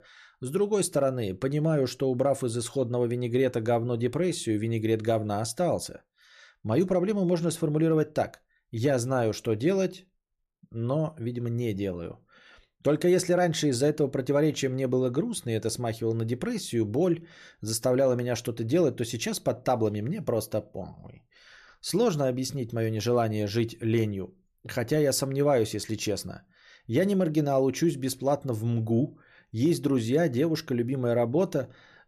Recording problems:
none

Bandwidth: 14.5 kHz